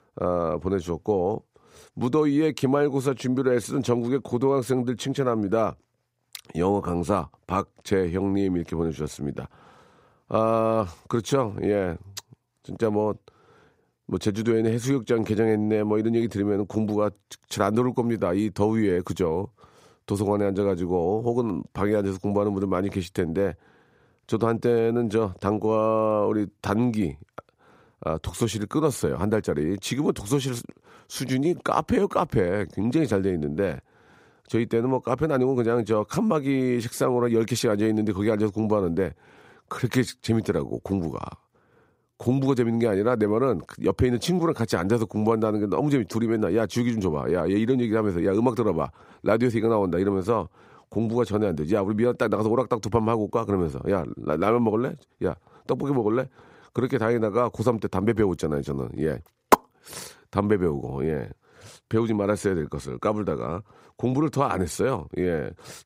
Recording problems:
none

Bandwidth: 15.5 kHz